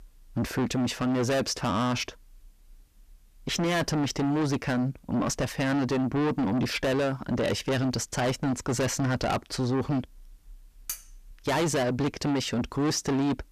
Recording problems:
distortion; heavy; 5 dB below the speech
clattering dishes; noticeable; at 11 s; peak 9 dB below the speech

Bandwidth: 14.5 kHz